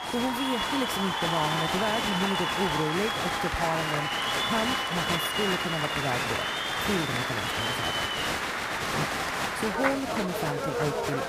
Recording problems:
crowd noise; very loud; throughout; 4 dB above the speech

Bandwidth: 15 kHz